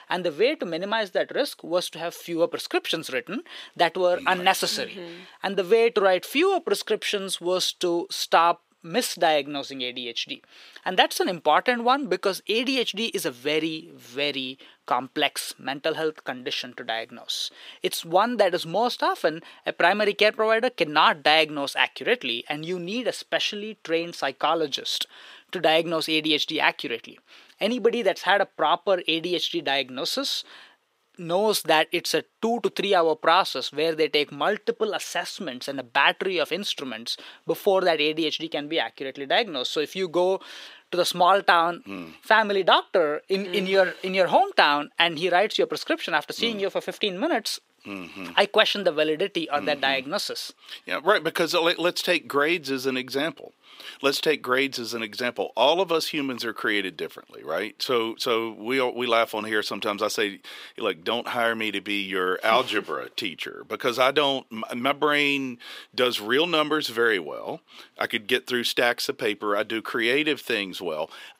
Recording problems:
thin; somewhat; fading below 400 Hz

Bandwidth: 15.5 kHz